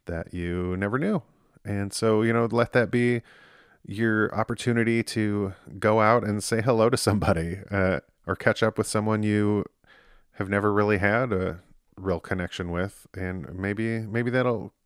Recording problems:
none

